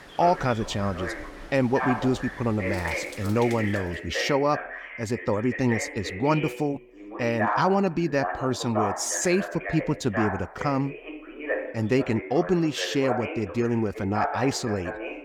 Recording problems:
voice in the background; loud; throughout; 7 dB below the speech
rain or running water; noticeable; until 3.5 s; 20 dB below the speech

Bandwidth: 17.5 kHz